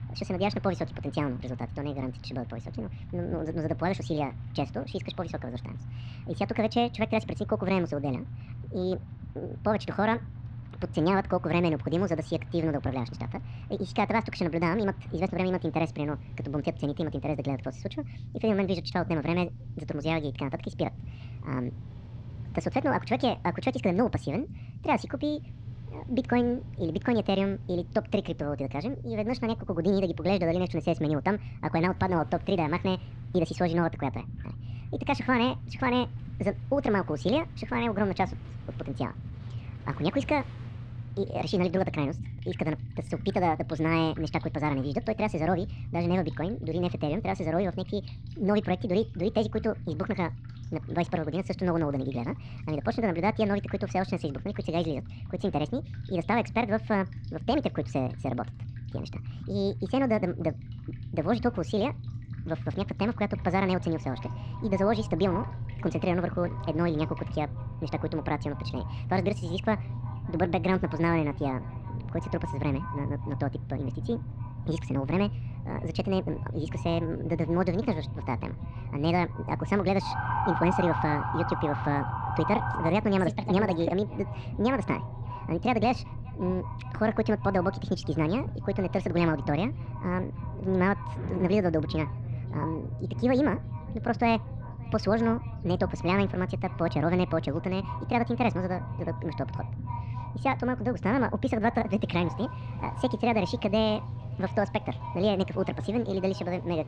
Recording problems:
wrong speed and pitch; too fast and too high; 1.6 times normal speed
echo of what is said; noticeable; from 1:03 on; 580 ms later, 20 dB below the speech
muffled; very slightly; fading above 4 kHz
rain or running water; faint; throughout; 25 dB below the speech
low rumble; faint; throughout; 20 dB below the speech
siren; loud; from 1:20 to 1:23; peak 1 dB above the speech

